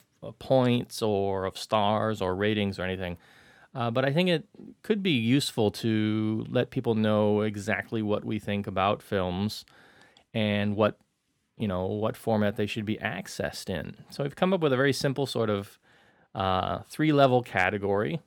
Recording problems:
none

